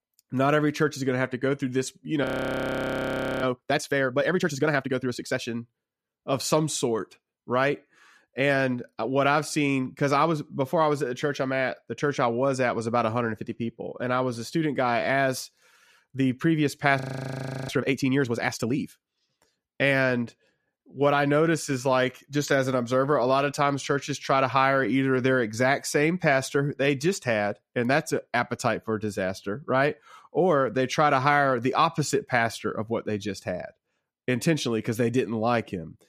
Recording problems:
audio freezing; at 2 s for 1 s and at 17 s for 0.5 s

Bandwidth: 14.5 kHz